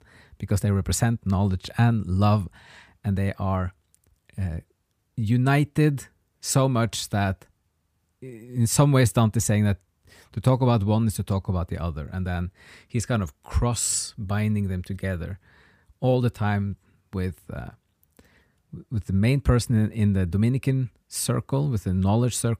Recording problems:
none

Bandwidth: 15 kHz